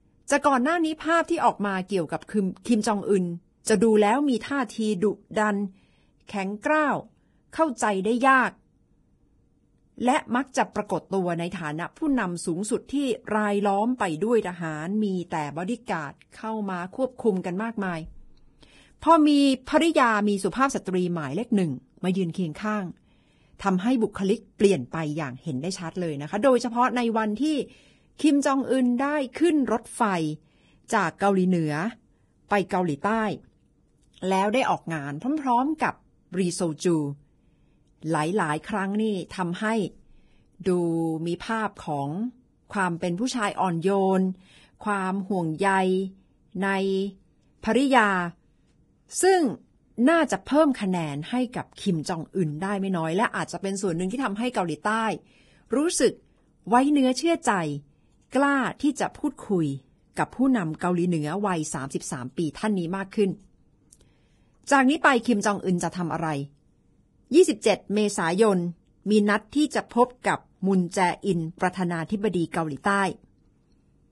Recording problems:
garbled, watery; badly; nothing above 10.5 kHz

